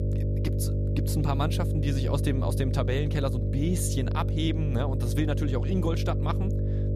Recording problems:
electrical hum; loud; throughout; 50 Hz, 5 dB below the speech

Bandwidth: 14.5 kHz